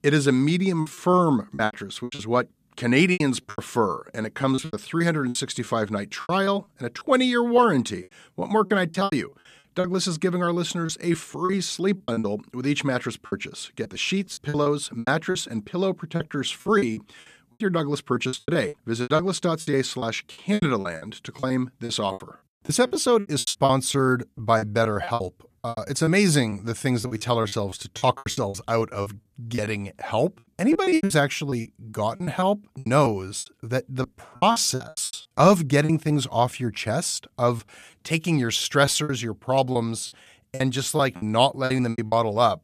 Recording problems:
choppy; very; 15% of the speech affected

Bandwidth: 14.5 kHz